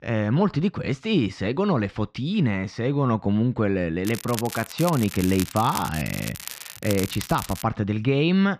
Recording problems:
muffled; very; fading above 3 kHz
crackling; noticeable; from 4 to 7.5 s; 10 dB below the speech

